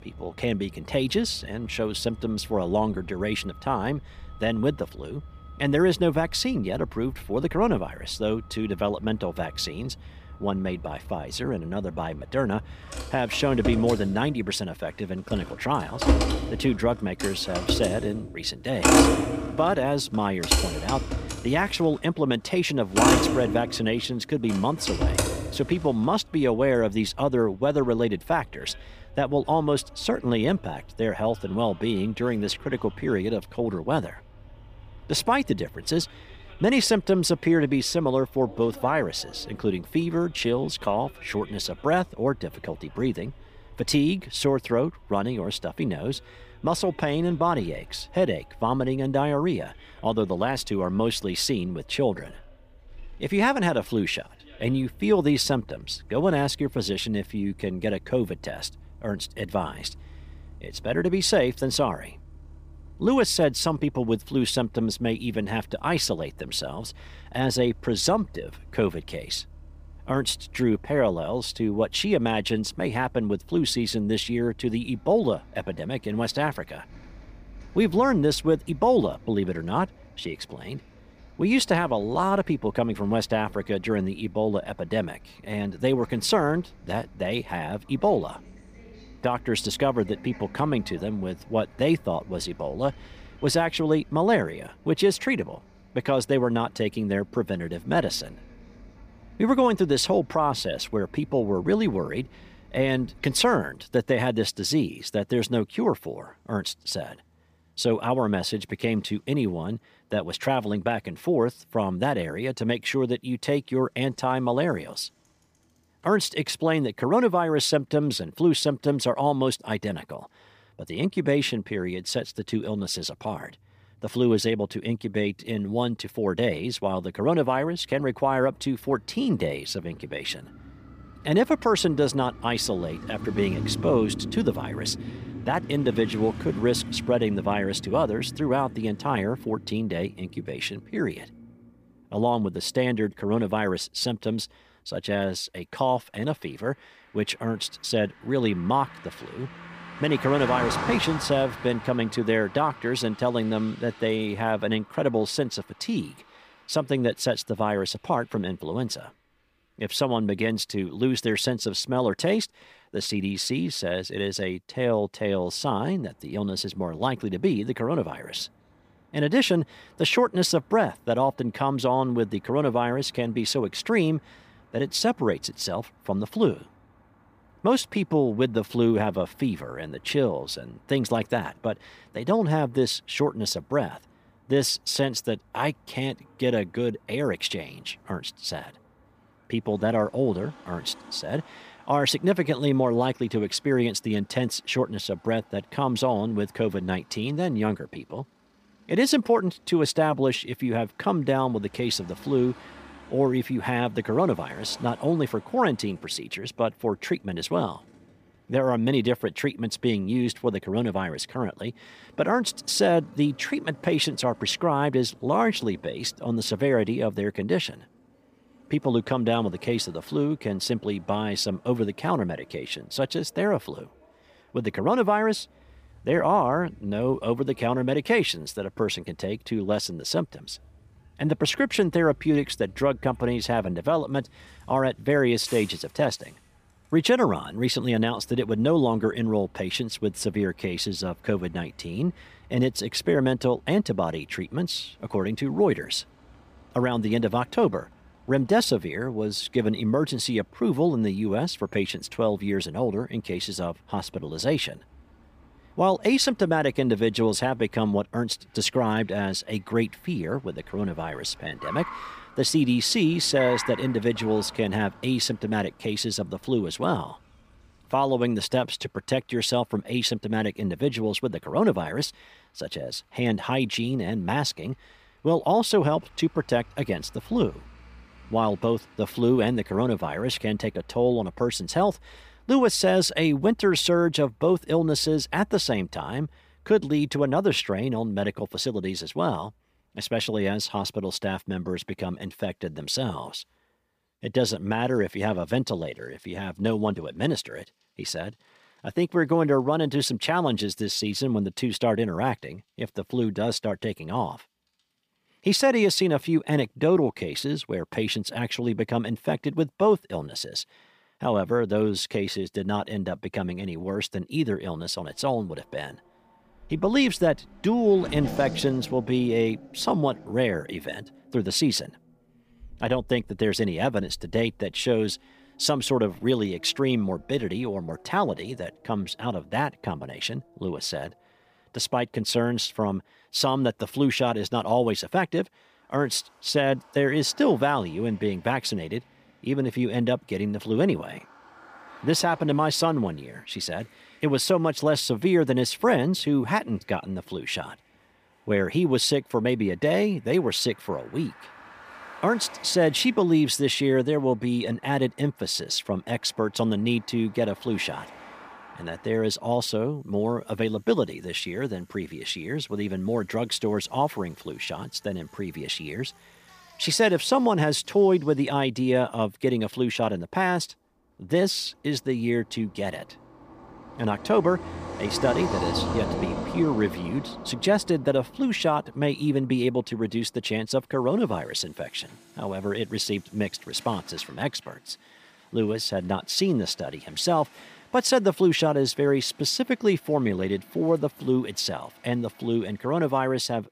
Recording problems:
traffic noise; noticeable; throughout; 10 dB below the speech

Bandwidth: 15 kHz